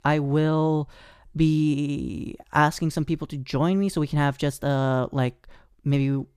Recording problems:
none

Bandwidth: 14.5 kHz